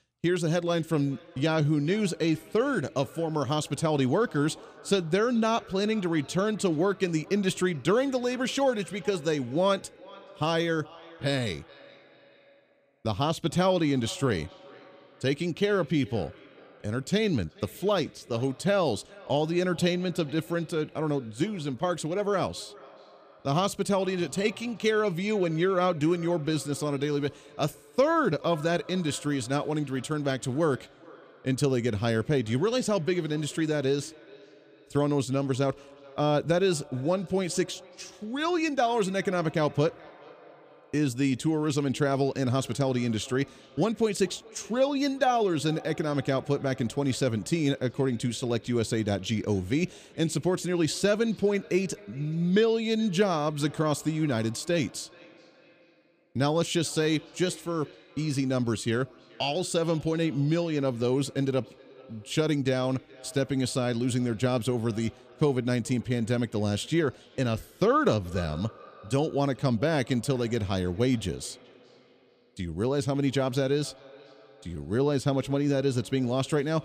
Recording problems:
echo of what is said; faint; throughout; 430 ms later, 25 dB below the speech

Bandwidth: 15 kHz